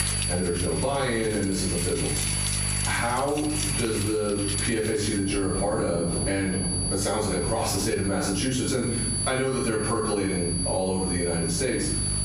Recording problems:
off-mic speech; far
room echo; noticeable; dies away in 0.6 s
squashed, flat; somewhat
high-pitched whine; loud; throughout; 10 kHz, 3 dB below the speech
rain or running water; loud; throughout; 9 dB below the speech
electrical hum; faint; throughout; 50 Hz, 20 dB below the speech

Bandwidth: 15.5 kHz